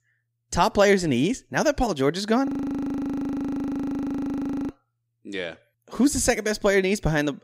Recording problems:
audio freezing; at 2.5 s for 2 s

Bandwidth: 15.5 kHz